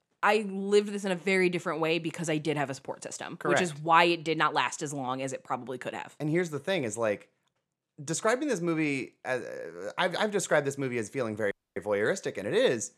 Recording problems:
audio cutting out; at 12 s

